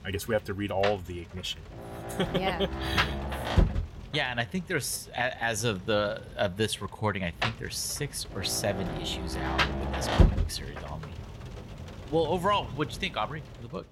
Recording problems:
rain or running water; loud; throughout; 1 dB below the speech

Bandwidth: 16 kHz